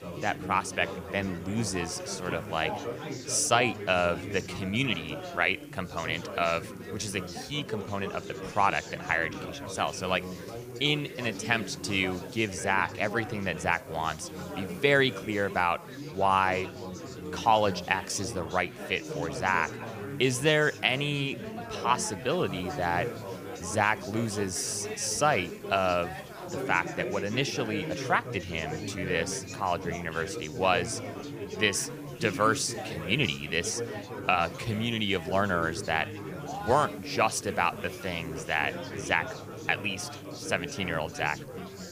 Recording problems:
chatter from many people; loud; throughout; 10 dB below the speech
hiss; faint; throughout; 25 dB below the speech

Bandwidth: 15 kHz